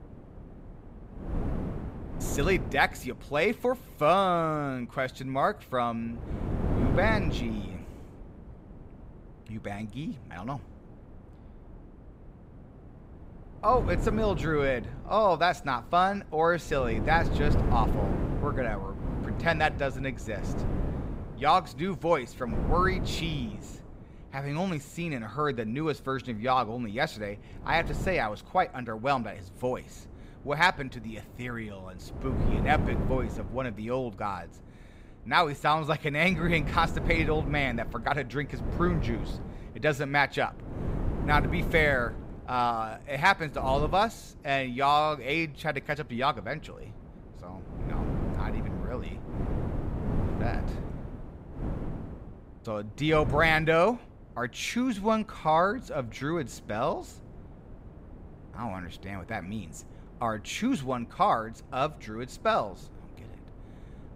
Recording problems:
wind noise on the microphone; occasional gusts; 15 dB below the speech

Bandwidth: 15.5 kHz